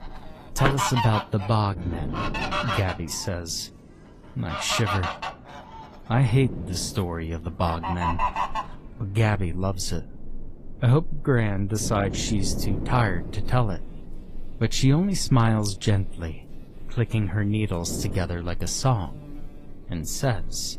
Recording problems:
garbled, watery; slightly; nothing above 14.5 kHz
animal sounds; loud; throughout; 7 dB below the speech
wind noise on the microphone; occasional gusts; 20 dB below the speech

